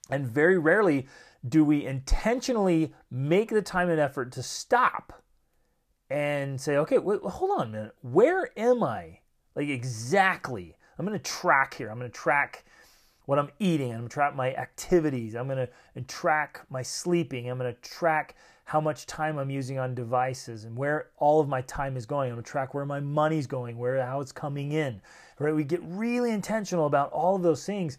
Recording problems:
none

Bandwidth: 14.5 kHz